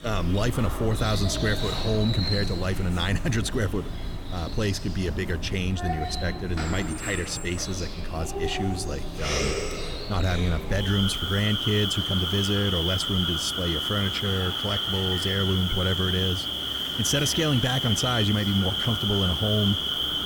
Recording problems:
animal sounds; loud; throughout; 1 dB below the speech

